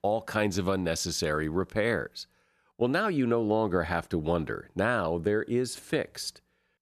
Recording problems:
none

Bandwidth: 13.5 kHz